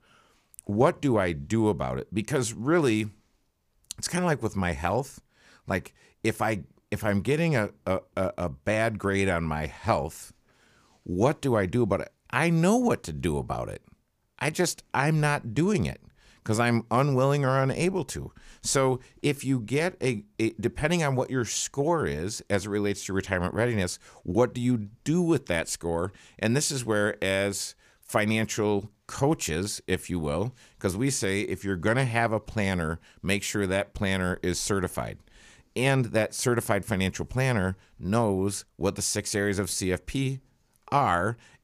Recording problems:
none

